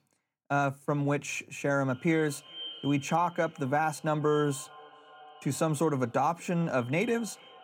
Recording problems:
echo of what is said; noticeable; from 2 s on; 410 ms later, 20 dB below the speech

